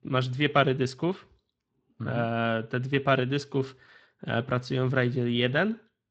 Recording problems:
garbled, watery; slightly; nothing above 7.5 kHz

